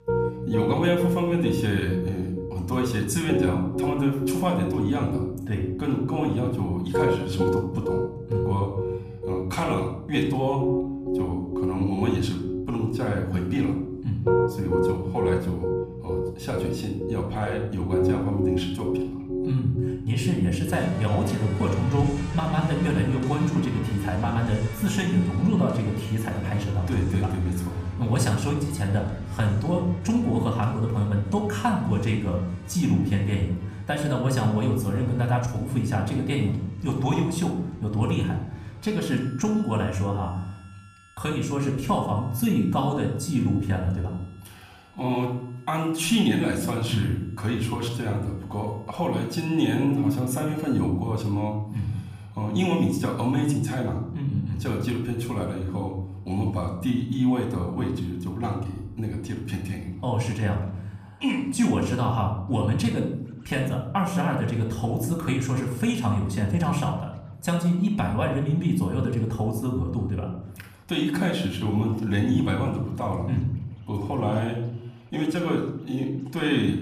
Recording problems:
room echo; slight; dies away in 0.7 s
off-mic speech; somewhat distant
background music; loud; throughout; 5 dB below the speech

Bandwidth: 15 kHz